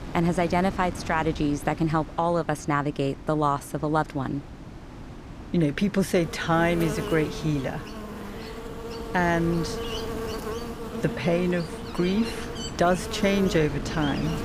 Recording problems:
electrical hum; loud; from 6 s on; 50 Hz, 9 dB below the speech
wind noise on the microphone; occasional gusts; 15 dB below the speech

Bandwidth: 15 kHz